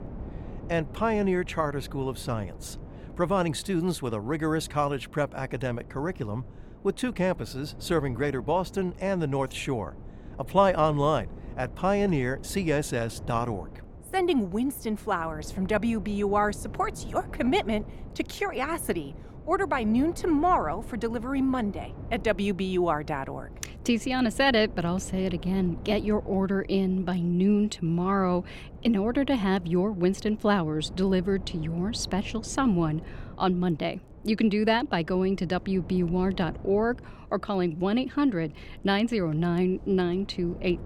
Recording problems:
wind noise on the microphone; occasional gusts; 20 dB below the speech

